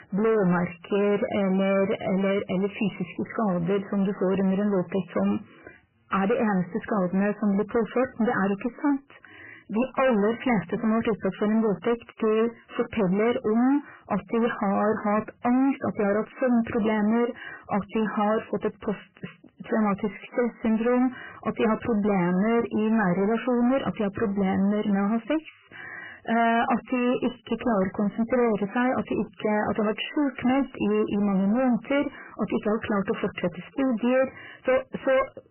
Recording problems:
distortion; heavy; 7 dB below the speech
garbled, watery; badly; nothing above 3 kHz

